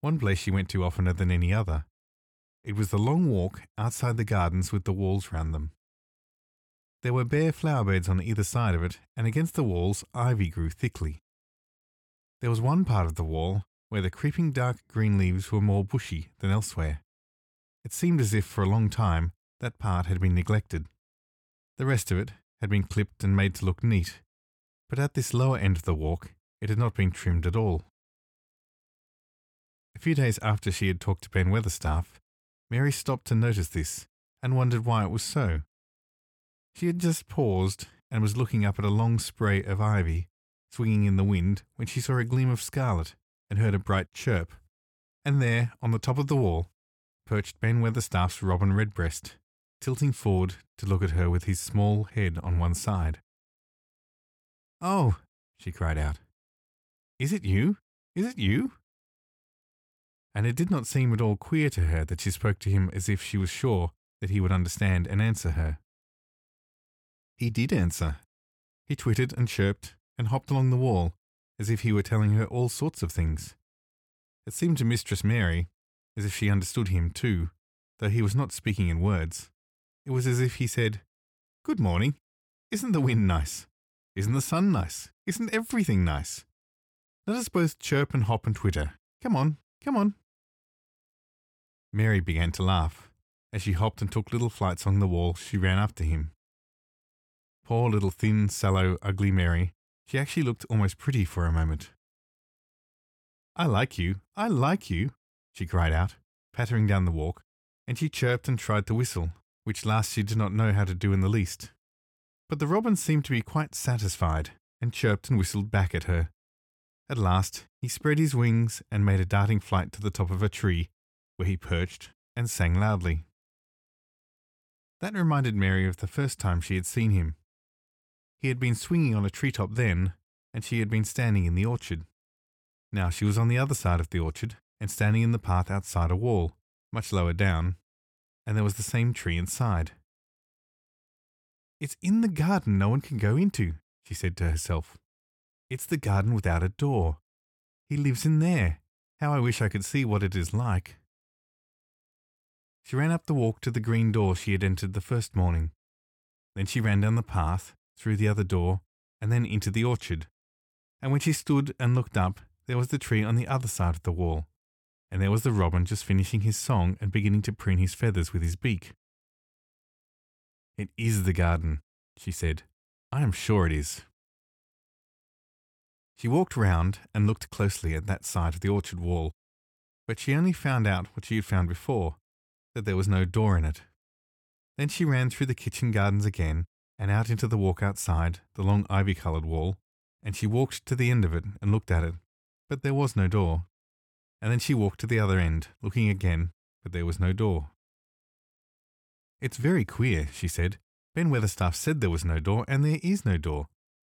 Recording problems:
none

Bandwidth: 17.5 kHz